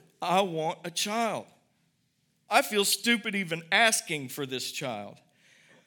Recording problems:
none

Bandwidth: 17.5 kHz